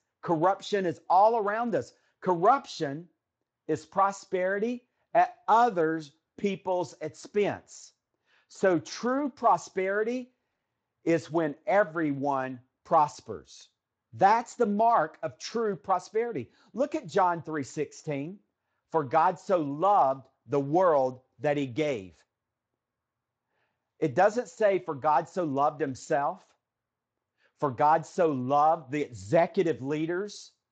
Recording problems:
garbled, watery; slightly; nothing above 7.5 kHz

